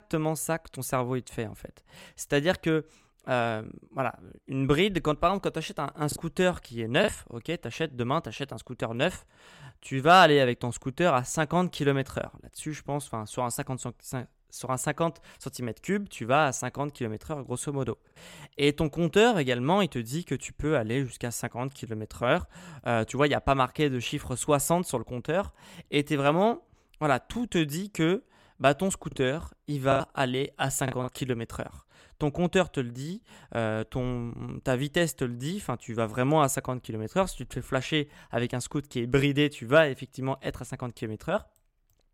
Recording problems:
choppy; occasionally; at 6 s and from 30 to 31 s; 3% of the speech affected

